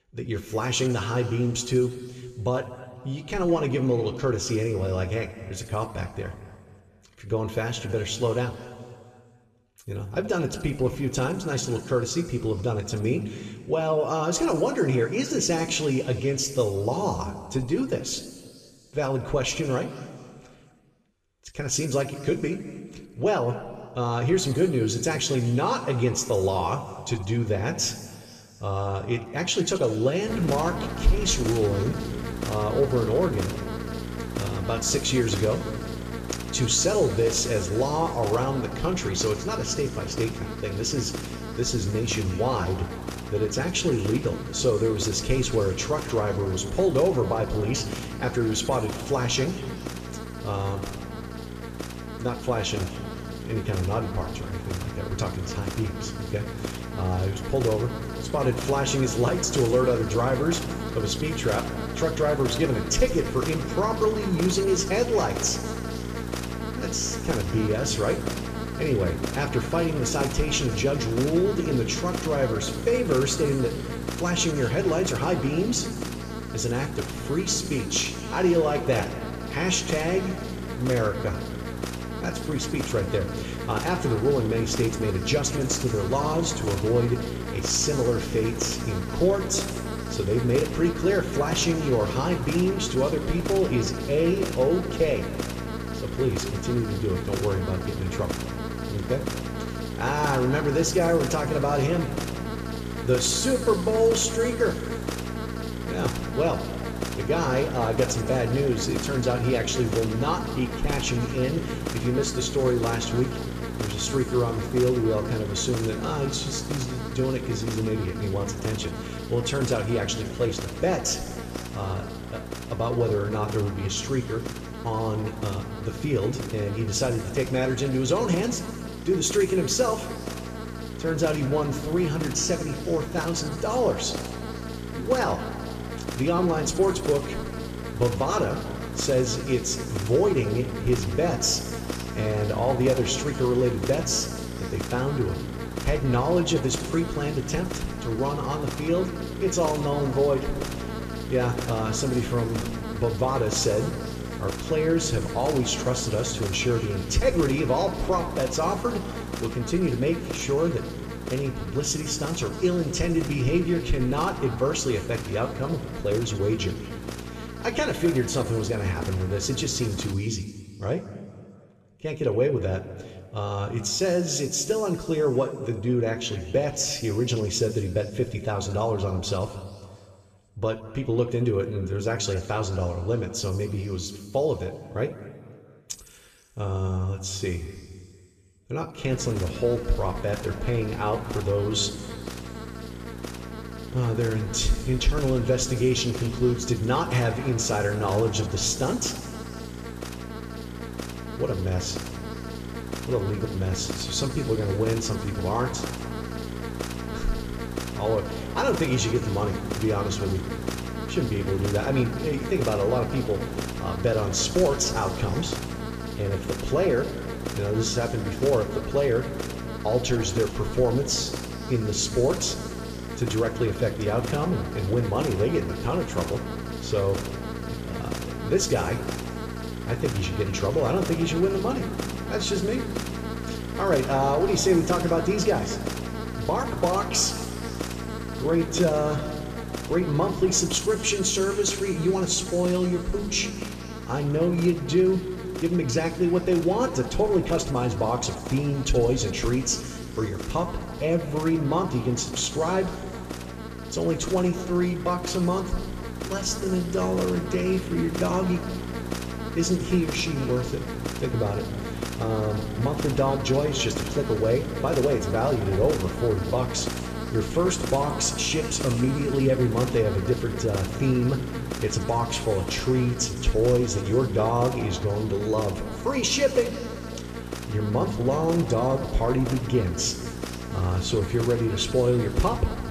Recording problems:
room echo; noticeable; dies away in 2.1 s
off-mic speech; somewhat distant
electrical hum; loud; from 30 s to 2:50 and from 3:09 on; 60 Hz, 9 dB below the speech

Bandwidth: 14.5 kHz